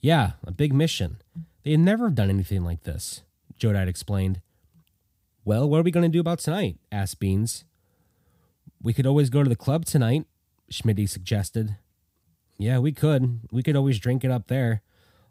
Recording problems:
none

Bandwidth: 15.5 kHz